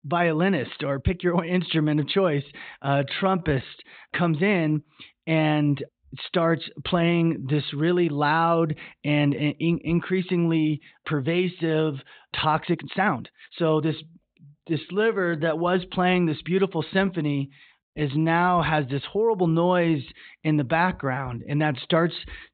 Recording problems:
high frequencies cut off; severe; nothing above 4 kHz
uneven, jittery; strongly; from 3 to 16 s

